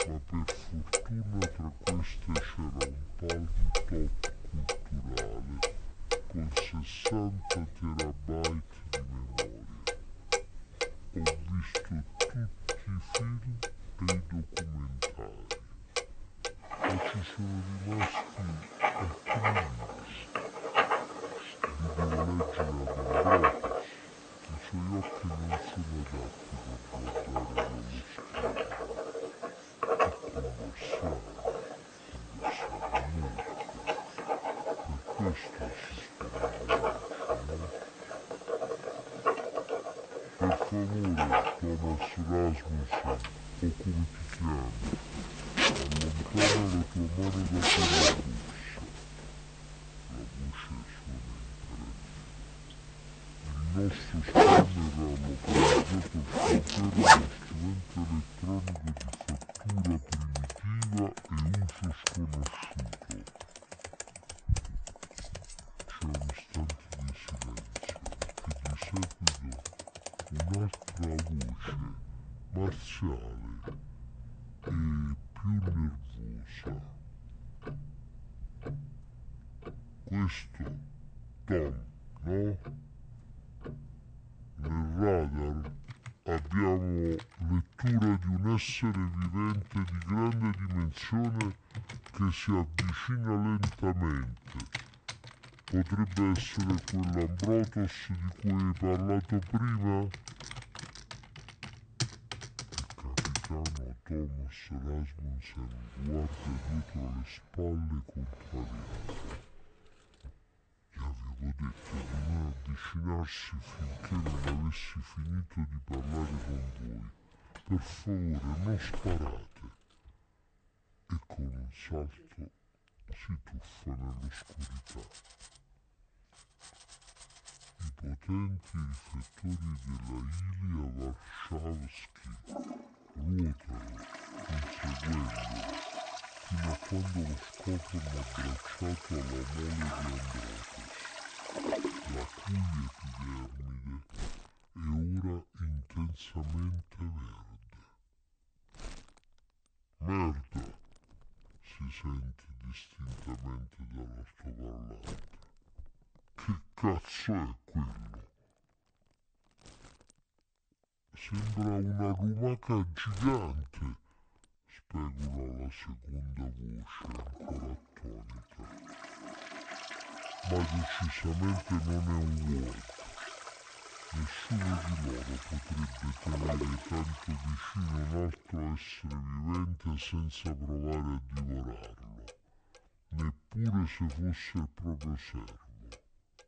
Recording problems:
wrong speed and pitch; too slow and too low; 0.6 times normal speed
household noises; very loud; throughout; 1 dB above the speech

